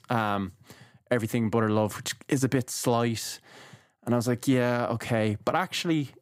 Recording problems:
none

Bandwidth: 15.5 kHz